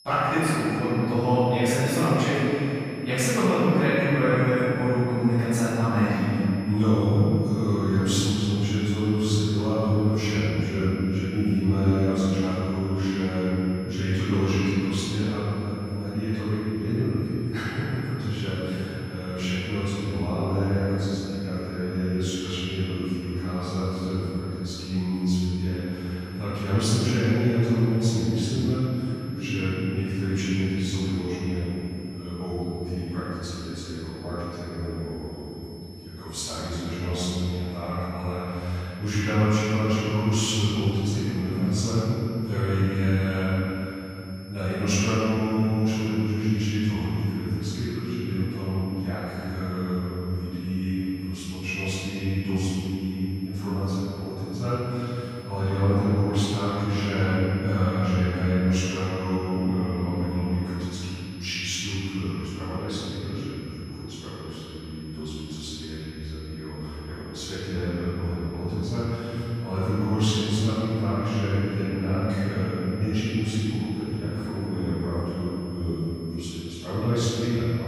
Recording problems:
room echo; strong; dies away in 3 s
off-mic speech; far
high-pitched whine; faint; throughout; 5 kHz, 25 dB below the speech

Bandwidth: 15 kHz